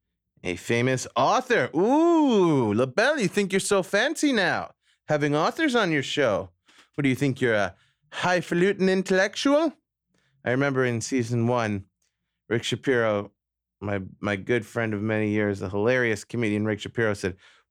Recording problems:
none

